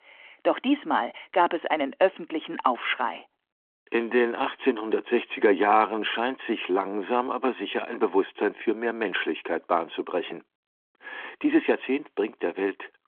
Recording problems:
phone-call audio; nothing above 3.5 kHz

